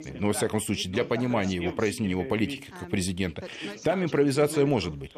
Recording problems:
background chatter; noticeable; throughout; 2 voices, 15 dB below the speech

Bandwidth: 14 kHz